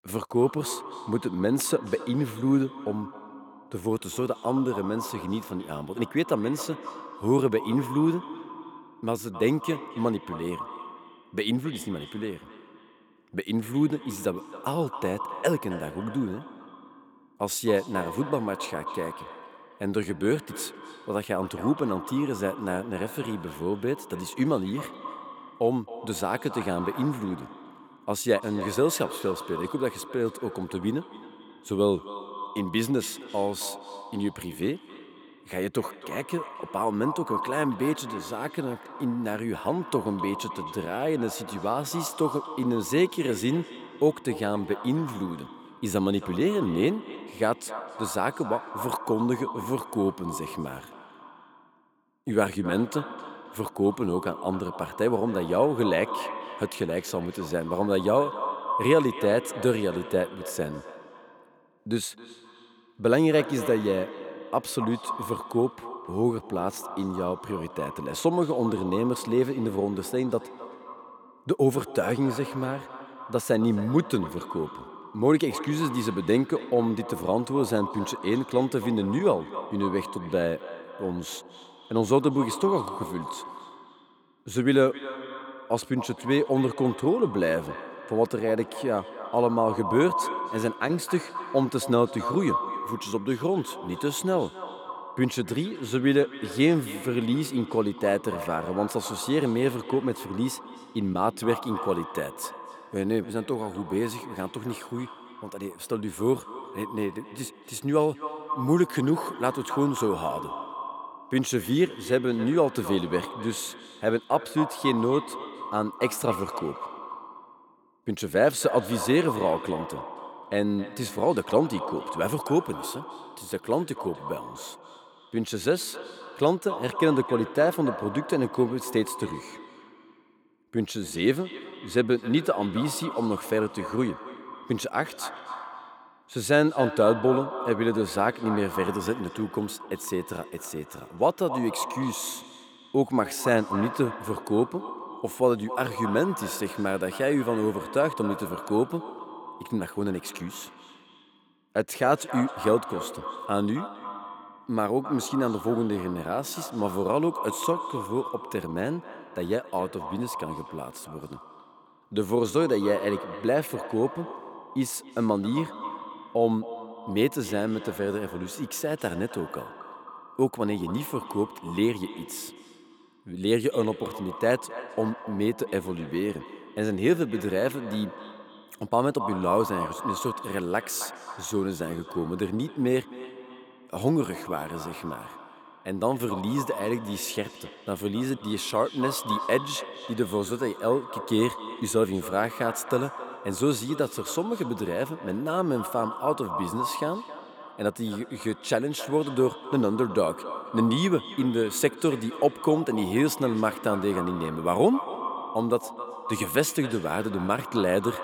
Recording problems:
echo of what is said; strong; throughout; 270 ms later, 10 dB below the speech

